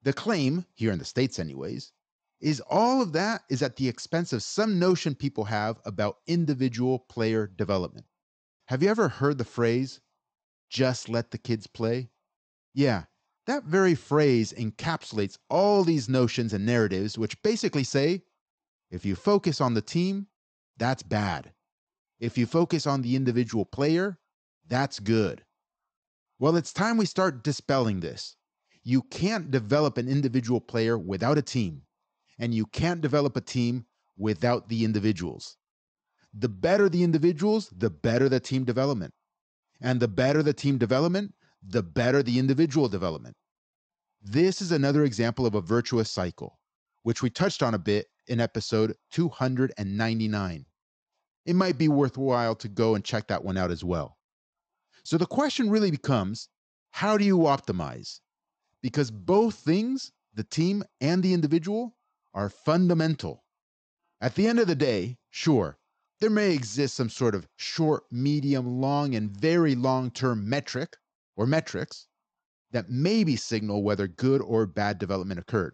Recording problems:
high frequencies cut off; noticeable; nothing above 8 kHz

